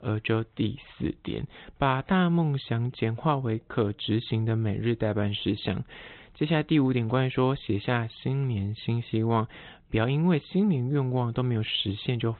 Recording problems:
high frequencies cut off; severe; nothing above 4 kHz

